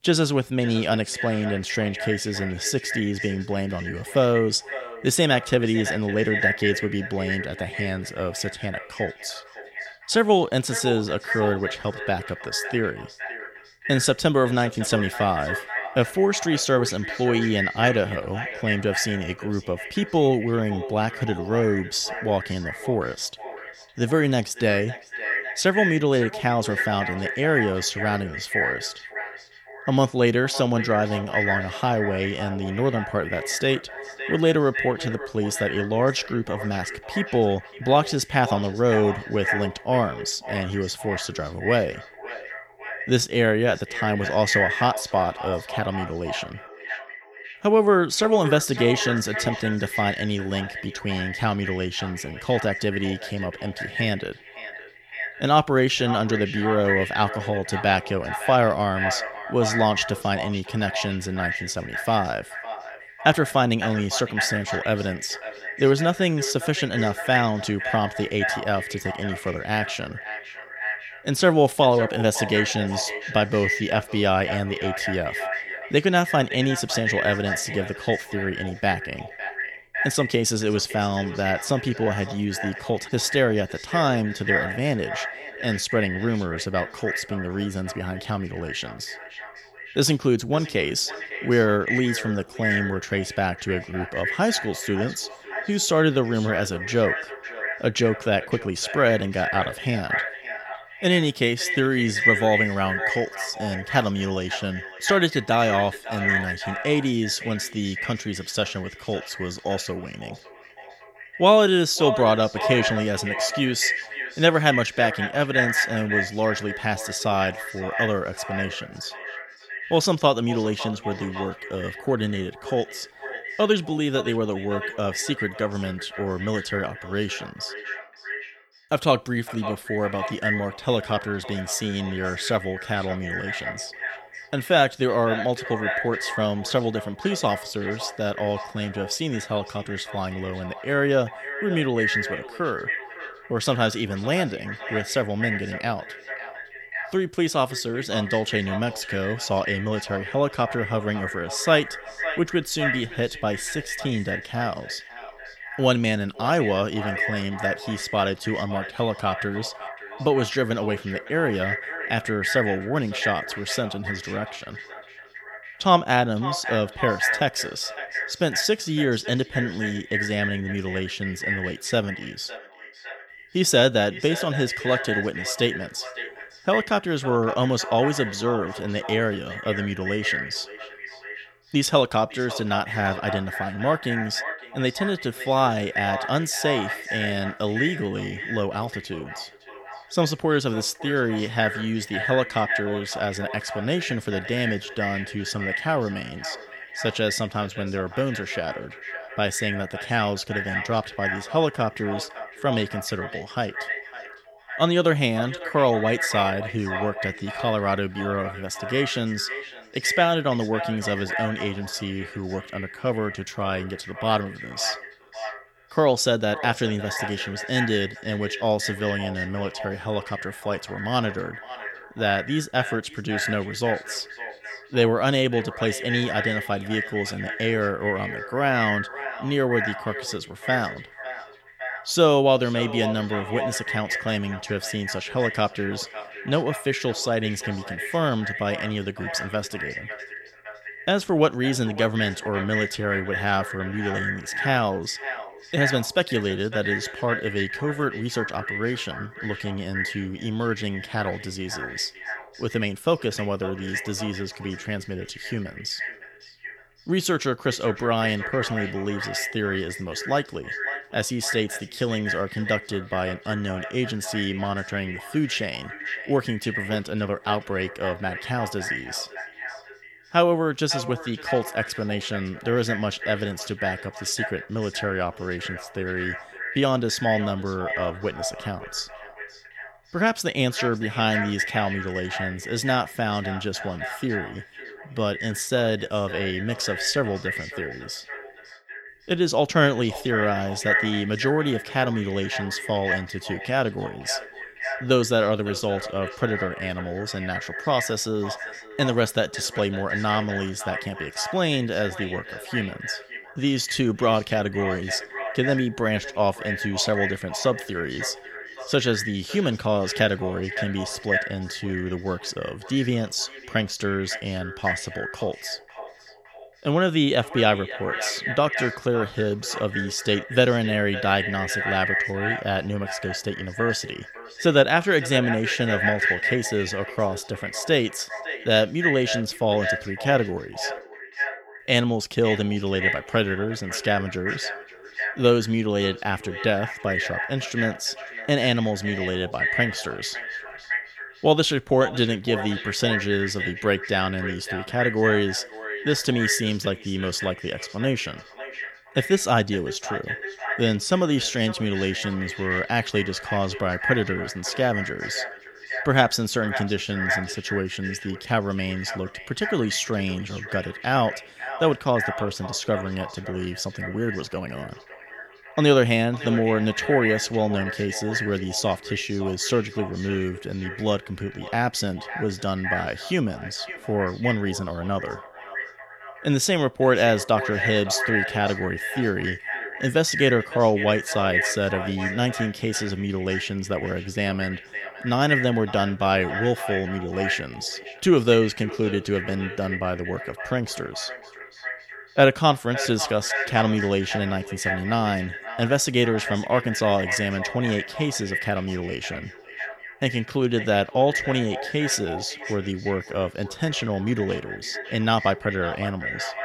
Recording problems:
echo of what is said; strong; throughout; 560 ms later, 7 dB below the speech

